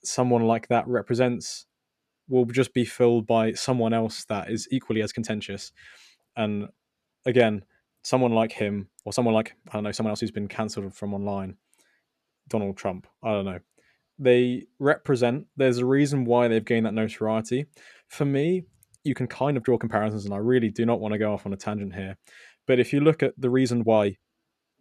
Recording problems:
uneven, jittery; strongly; from 4.5 to 24 s

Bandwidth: 13.5 kHz